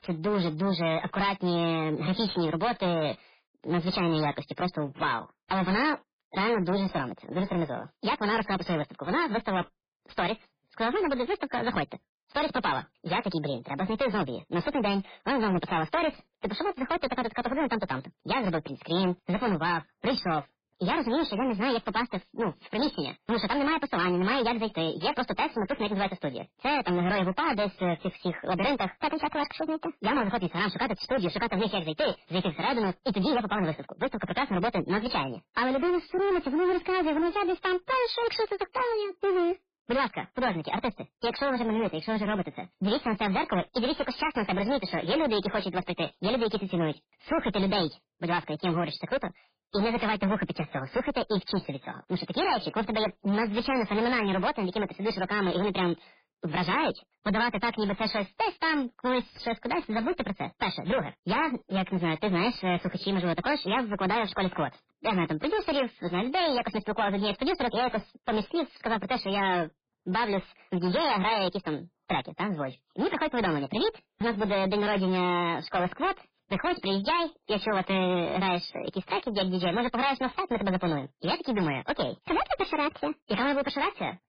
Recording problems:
distortion; heavy; 16% of the sound clipped
garbled, watery; badly; nothing above 4.5 kHz
wrong speed and pitch; too fast and too high; 1.5 times normal speed

